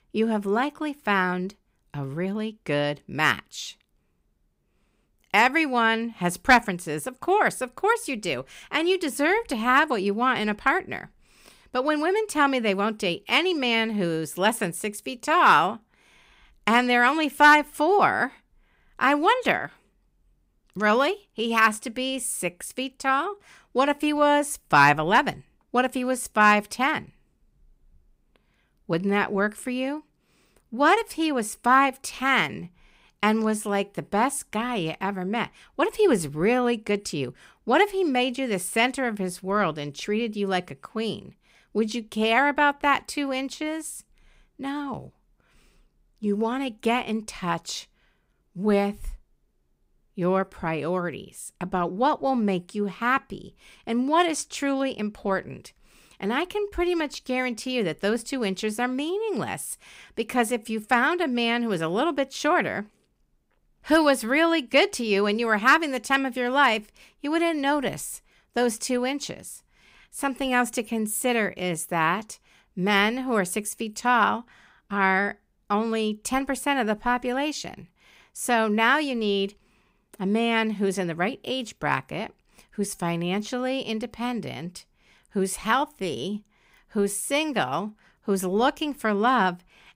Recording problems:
none

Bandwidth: 15.5 kHz